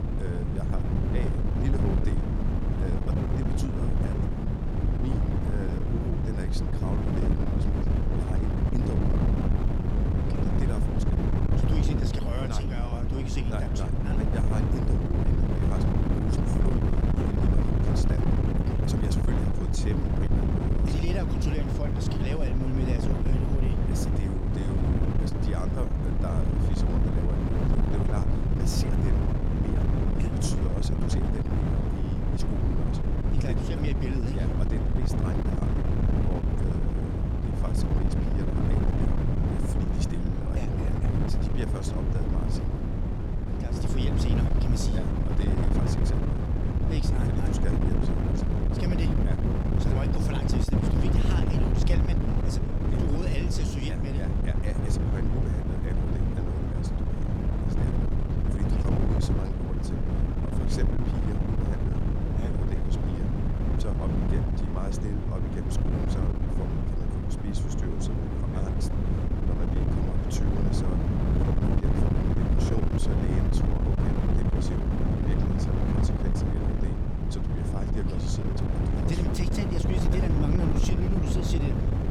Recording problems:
wind noise on the microphone; heavy; 5 dB above the speech

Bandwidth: 17.5 kHz